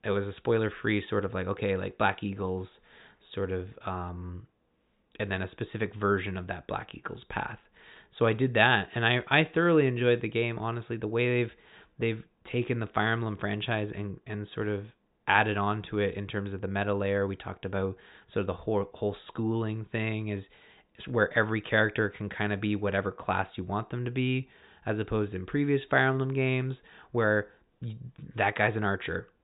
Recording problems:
high frequencies cut off; severe; nothing above 4 kHz

